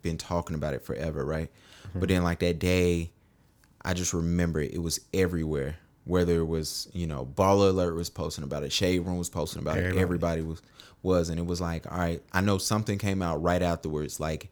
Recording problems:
none

